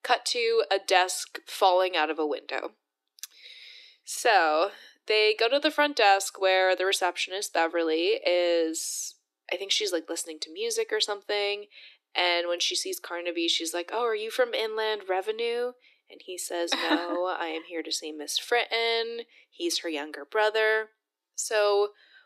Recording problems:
thin; very; fading below 300 Hz

